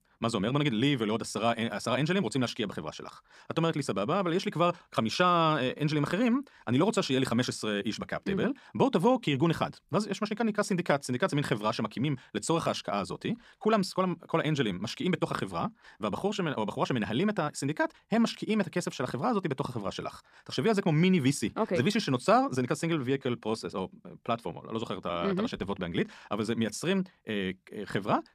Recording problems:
wrong speed, natural pitch; too fast; 1.5 times normal speed

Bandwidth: 14.5 kHz